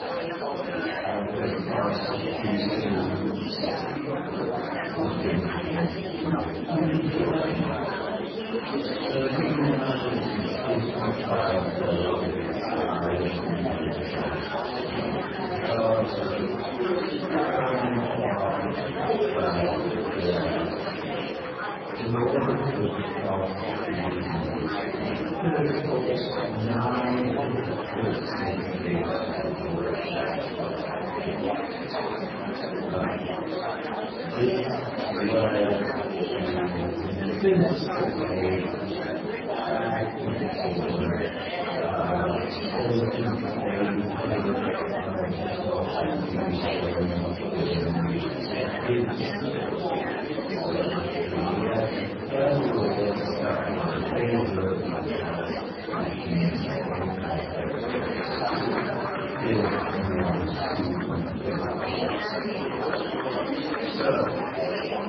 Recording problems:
room echo; strong; dies away in 1 s
off-mic speech; far
garbled, watery; badly
wrong speed, natural pitch; too slow; 0.5 times normal speed
murmuring crowd; very loud; throughout; as loud as the speech

